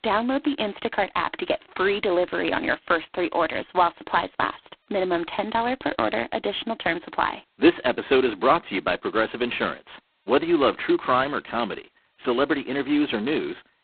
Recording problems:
phone-call audio; poor line; nothing above 4 kHz

